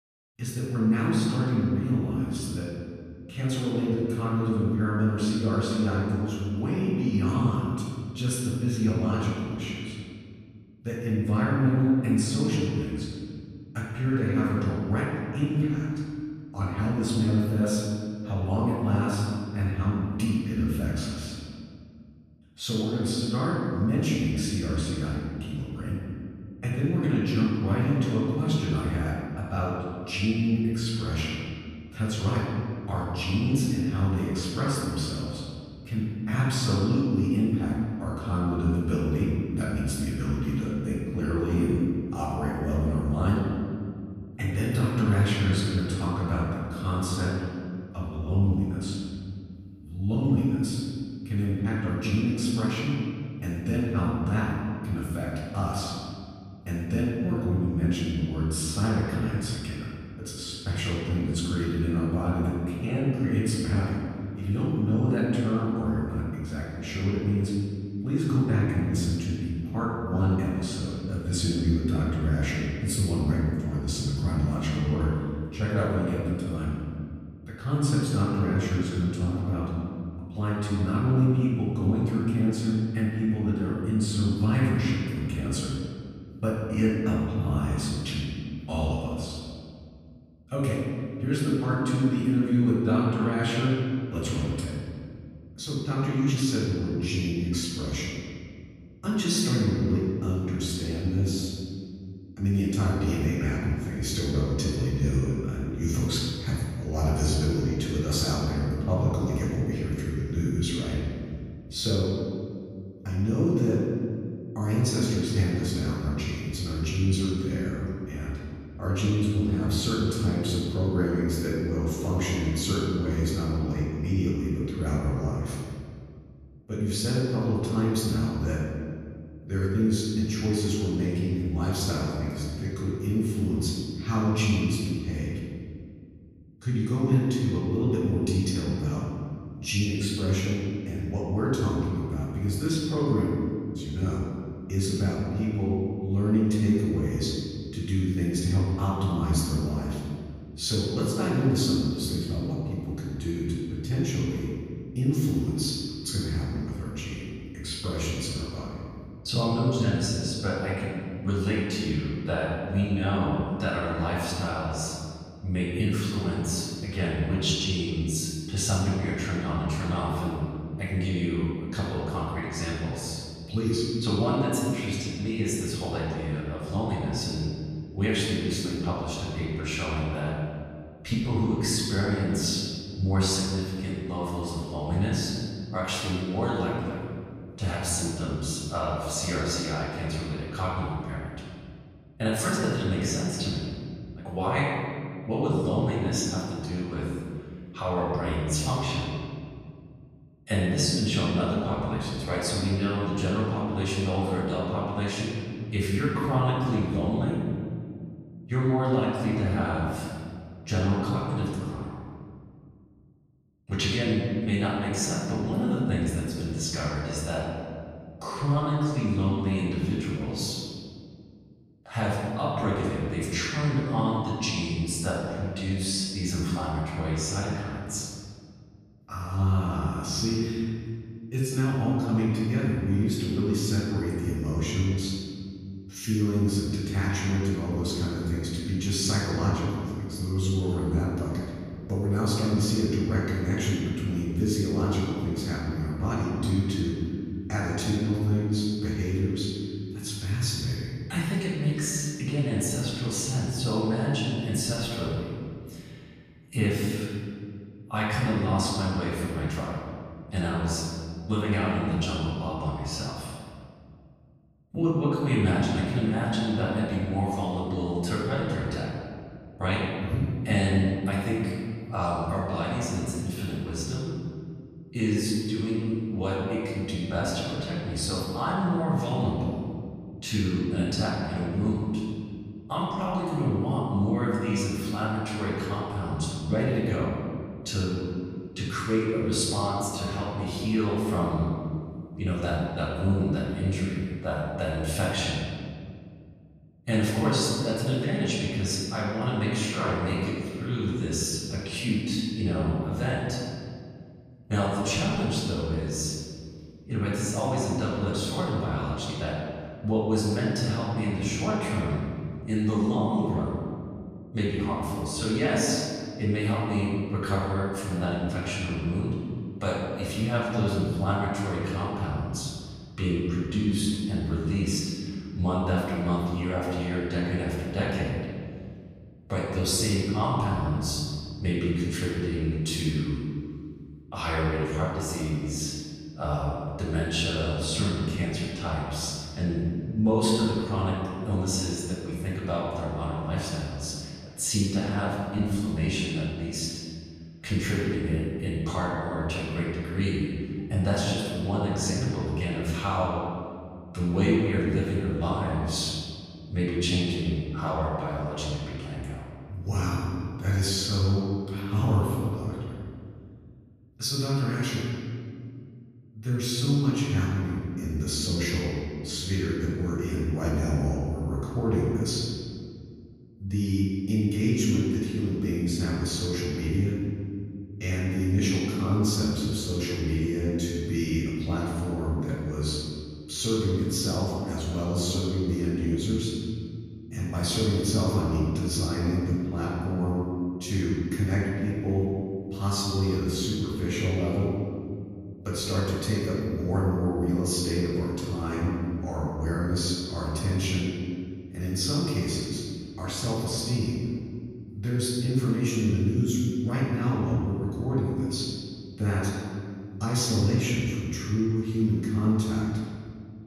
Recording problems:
room echo; strong; dies away in 2 s
off-mic speech; far

